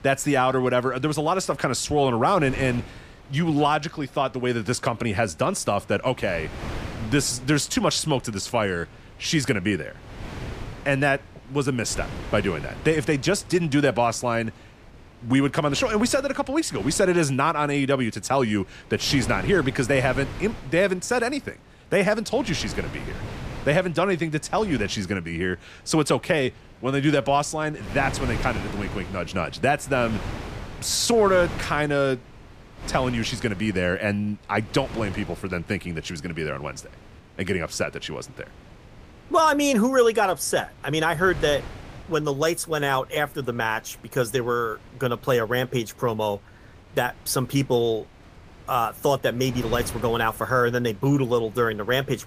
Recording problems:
wind noise on the microphone; occasional gusts; 20 dB below the speech

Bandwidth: 15 kHz